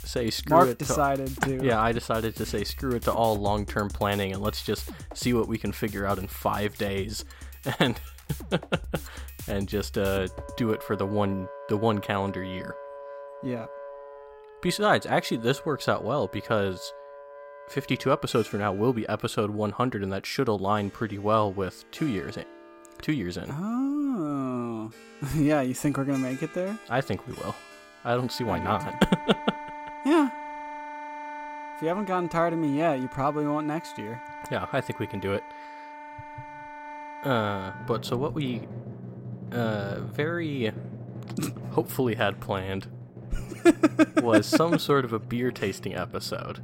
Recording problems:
background music; noticeable; throughout; 15 dB below the speech

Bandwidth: 16 kHz